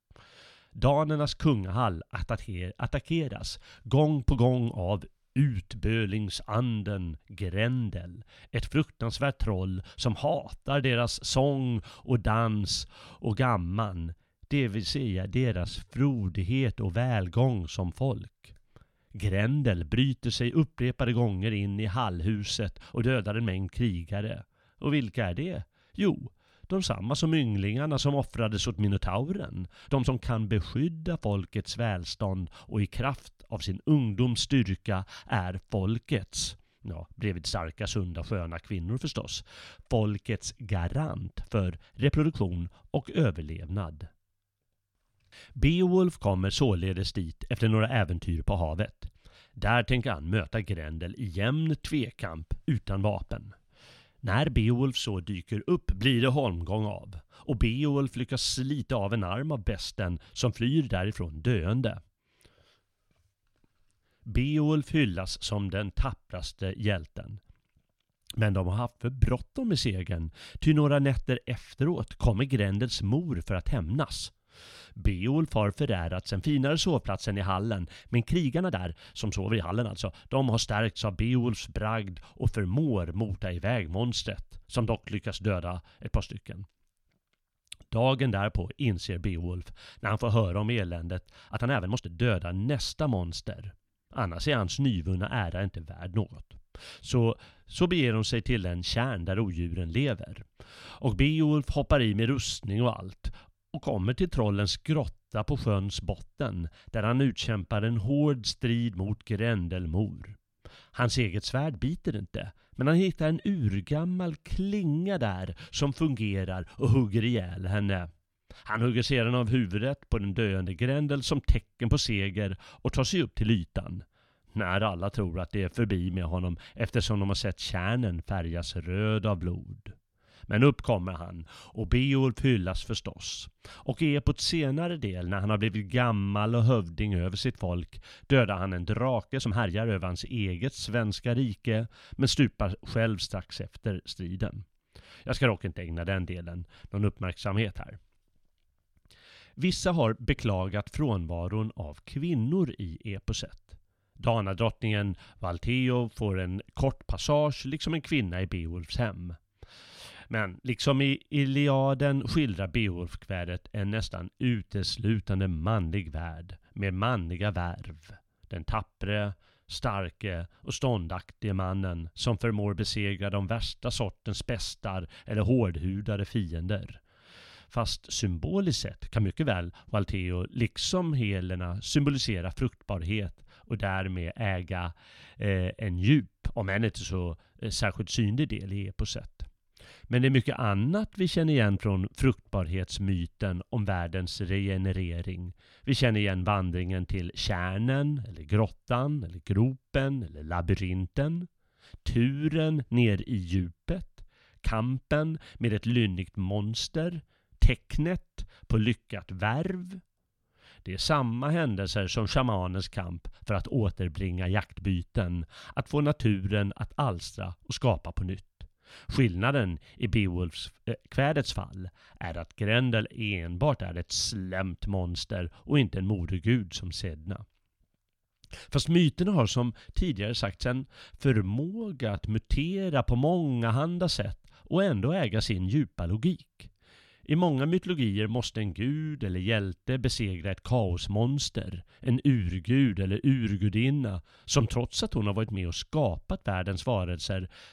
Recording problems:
uneven, jittery; strongly; from 15 s to 3:52

